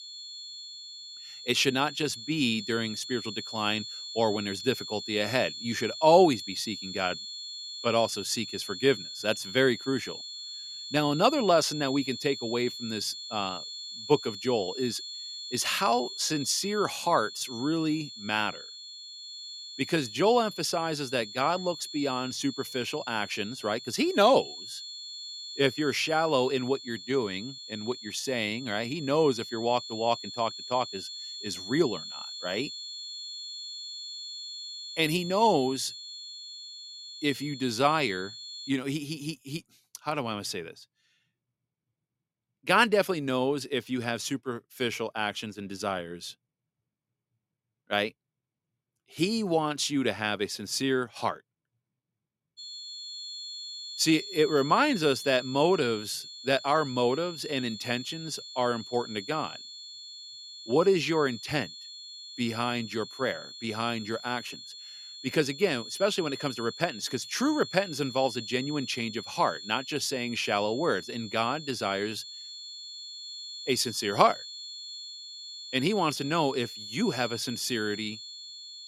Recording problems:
high-pitched whine; noticeable; until 39 s and from 53 s on; 4.5 kHz, 10 dB below the speech

